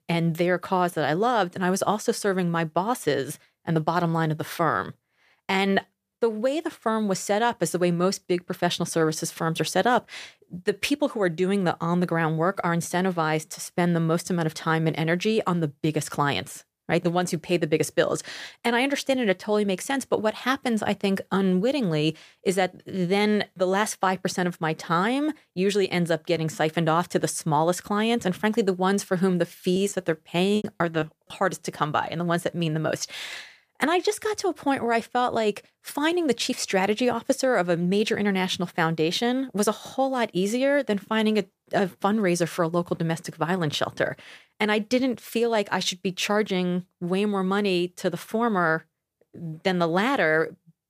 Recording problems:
choppy; very; from 30 to 31 s; 13% of the speech affected

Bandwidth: 15 kHz